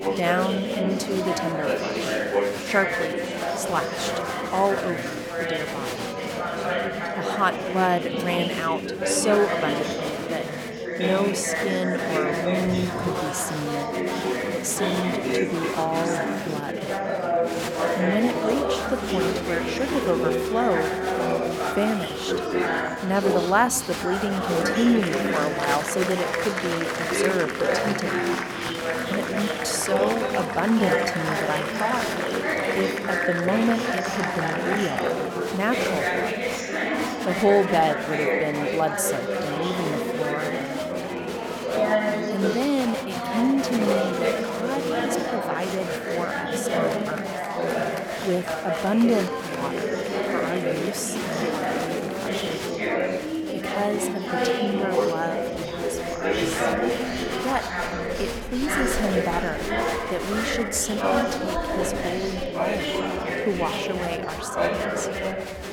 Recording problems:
chatter from many people; very loud; throughout; 1 dB above the speech

